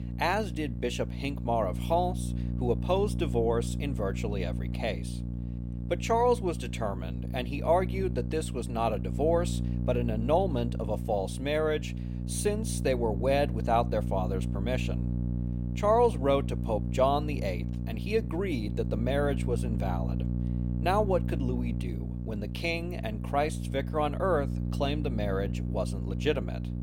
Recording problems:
electrical hum; noticeable; throughout; 60 Hz, 15 dB below the speech

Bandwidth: 16 kHz